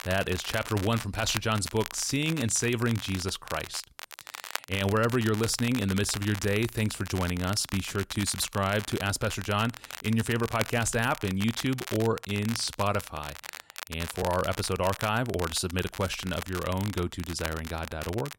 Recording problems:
crackle, like an old record; noticeable; 10 dB below the speech

